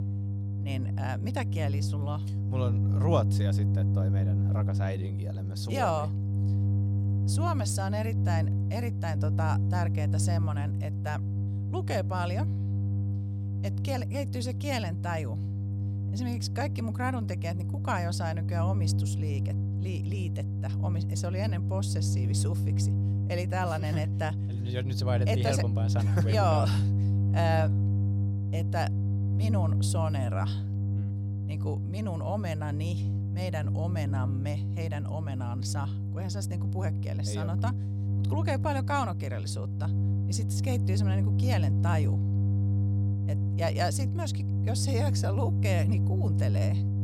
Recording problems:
electrical hum; loud; throughout; 50 Hz, 7 dB below the speech

